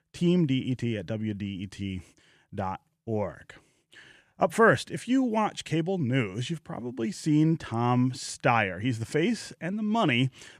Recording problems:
none

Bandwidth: 14.5 kHz